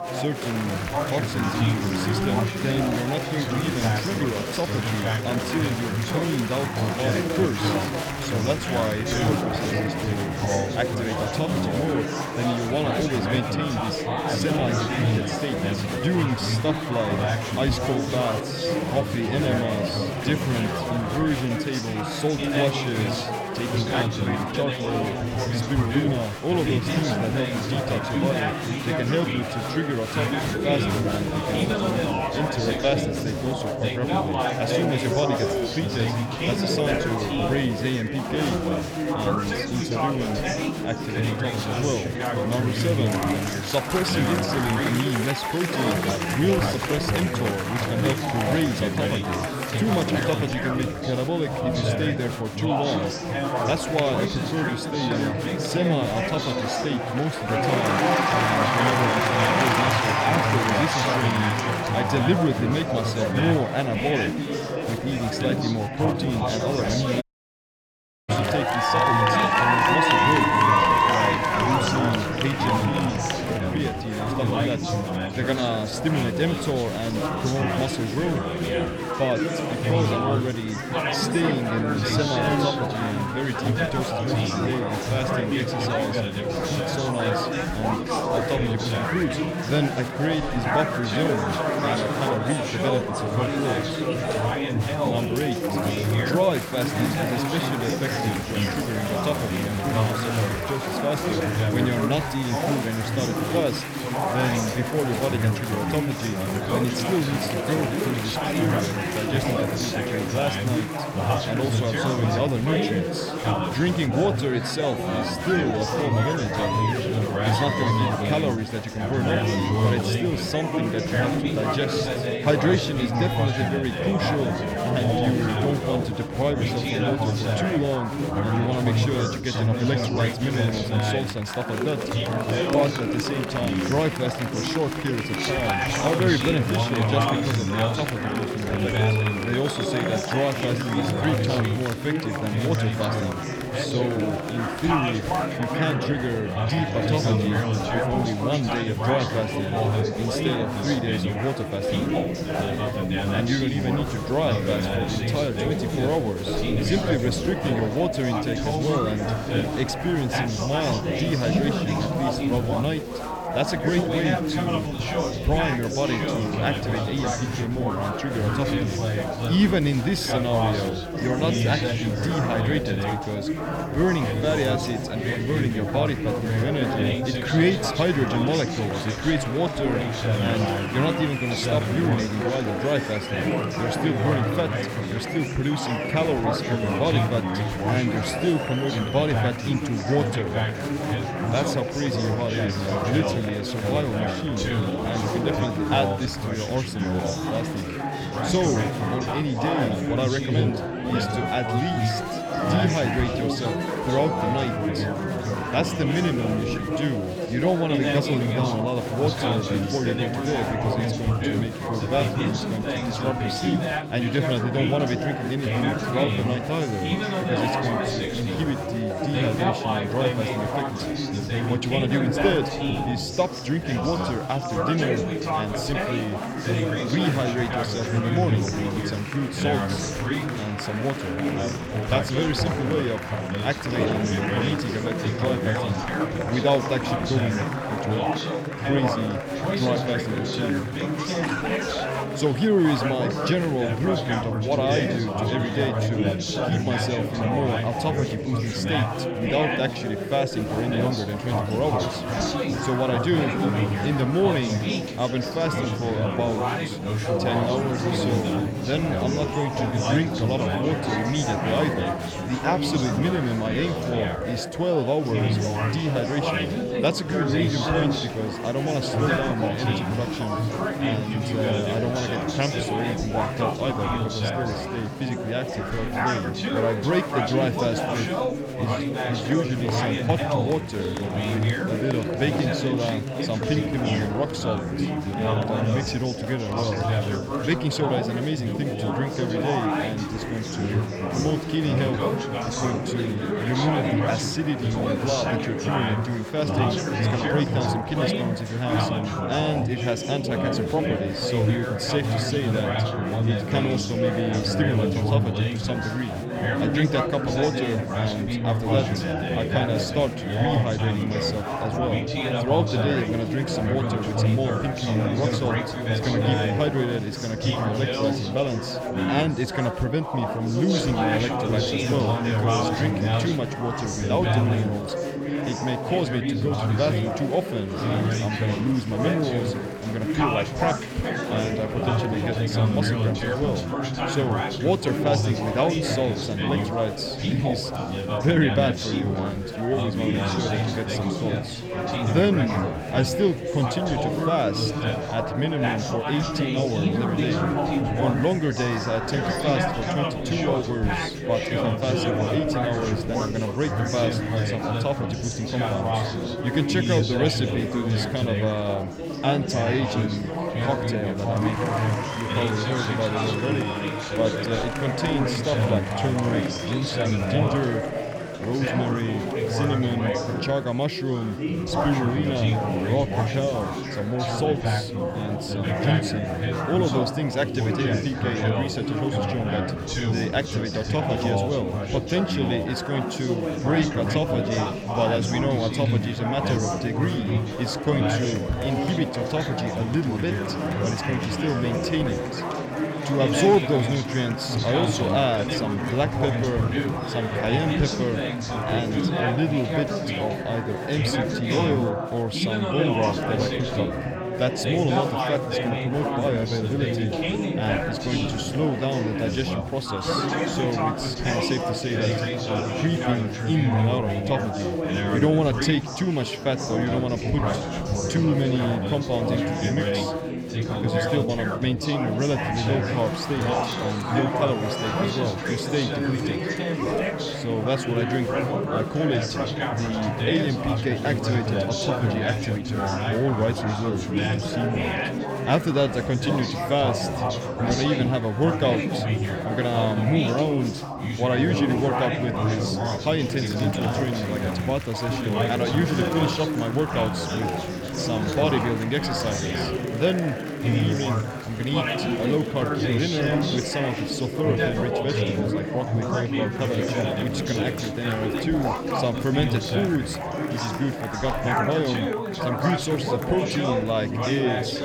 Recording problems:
chatter from many people; very loud; throughout; 1 dB above the speech
audio cutting out; at 1:07 for 1 s

